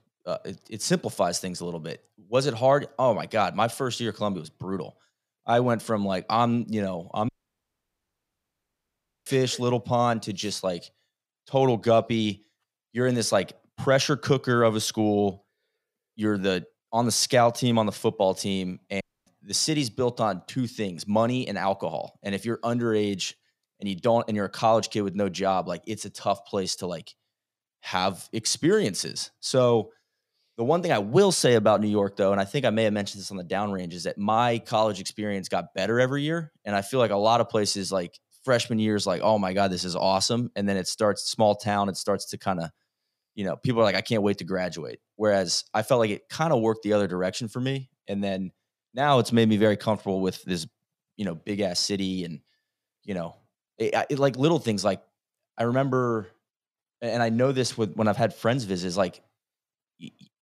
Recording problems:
audio cutting out; at 7.5 s for 2 s and at 19 s

